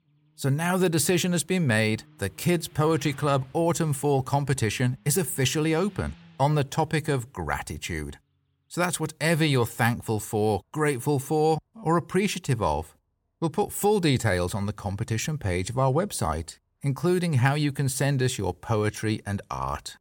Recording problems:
traffic noise; faint; throughout; 30 dB below the speech

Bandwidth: 17 kHz